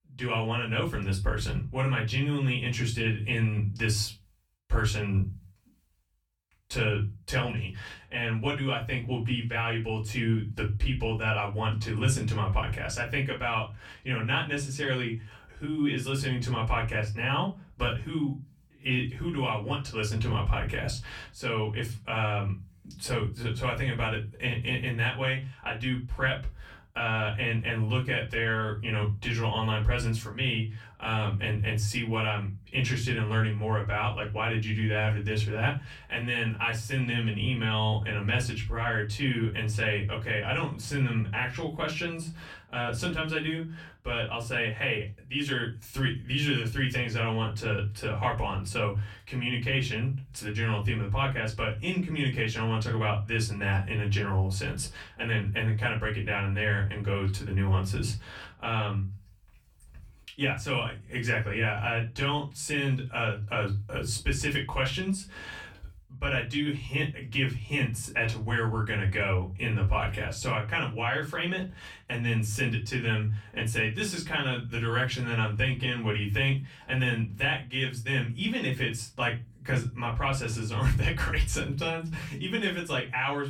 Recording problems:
off-mic speech; far
room echo; very slight; dies away in 0.4 s

